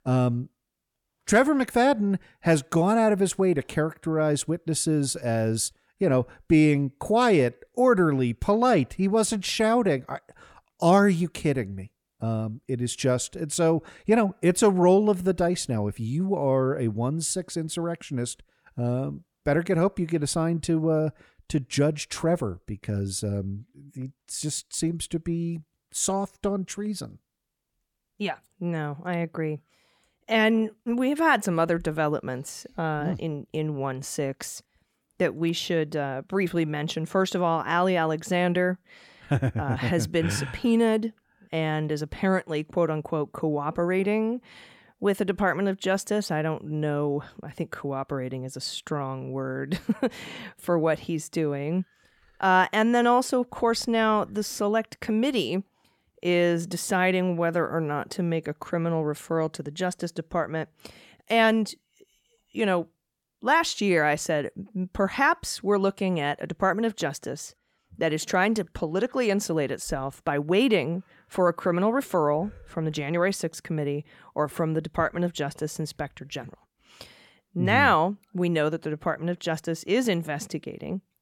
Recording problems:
none

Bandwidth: 17.5 kHz